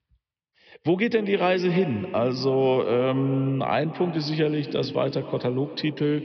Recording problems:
echo of what is said; noticeable; throughout; 240 ms later, 10 dB below the speech
high frequencies cut off; noticeable; nothing above 5.5 kHz

